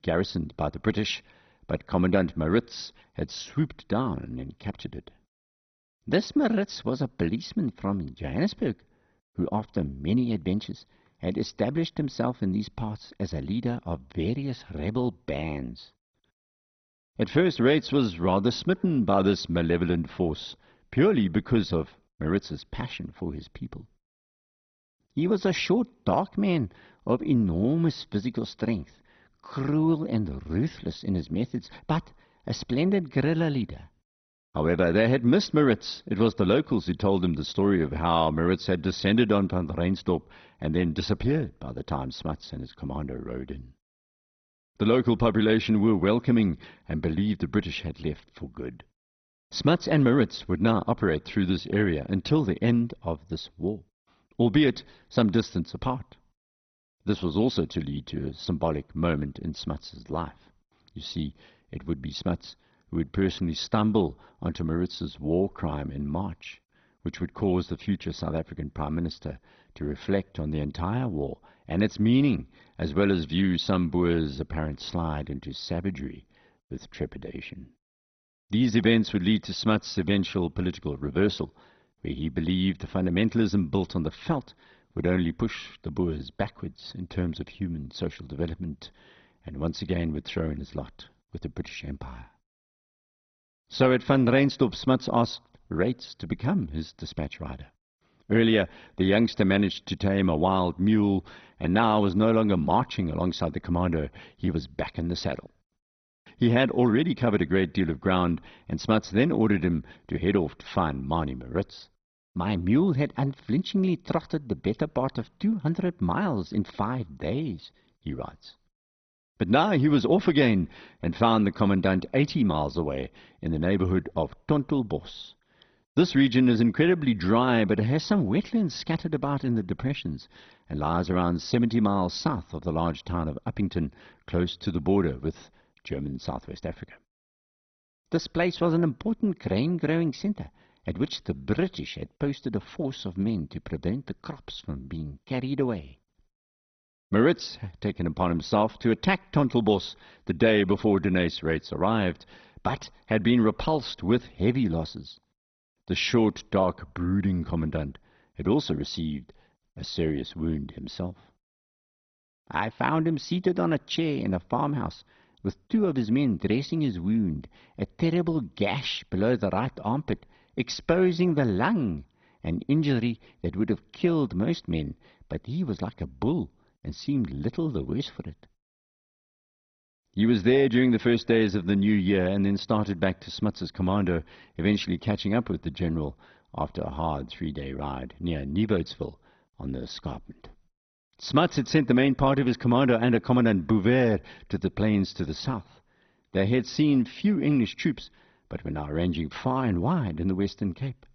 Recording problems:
garbled, watery; badly; nothing above 6 kHz

